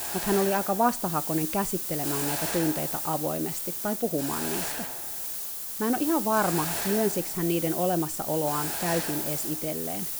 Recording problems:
hiss; loud; throughout; 1 dB below the speech

